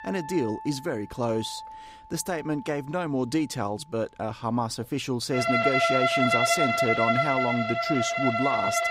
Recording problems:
background music; very loud; throughout; 4 dB above the speech

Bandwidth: 15.5 kHz